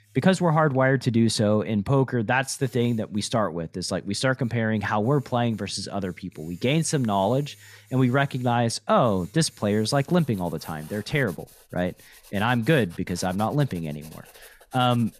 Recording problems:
household noises; faint; throughout; 25 dB below the speech

